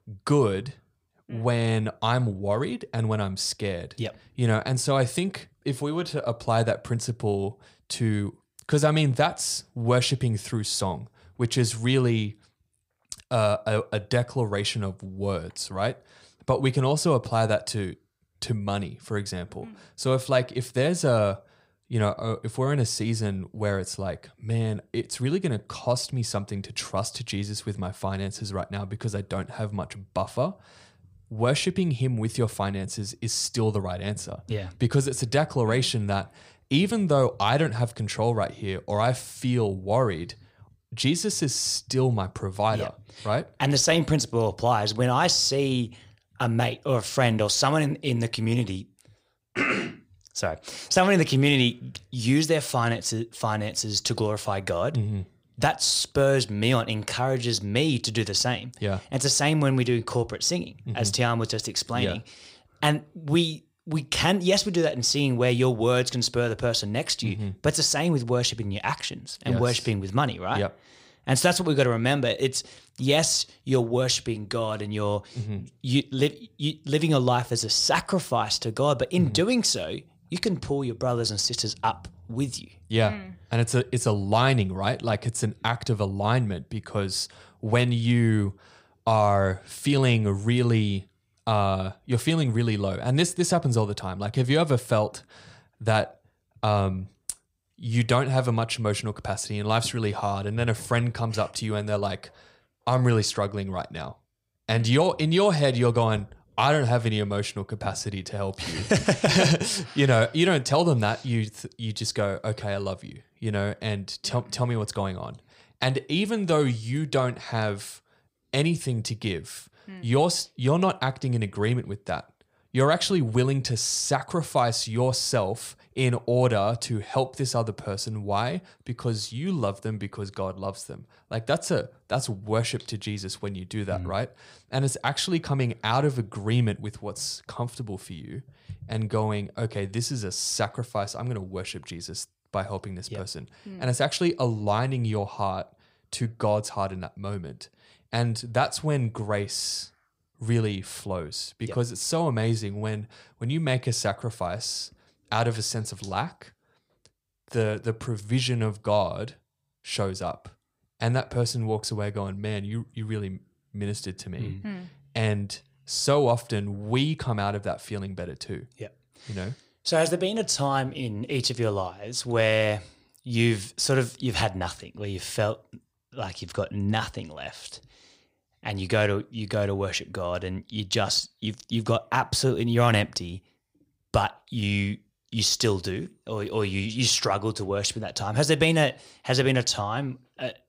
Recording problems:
none

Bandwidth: 15.5 kHz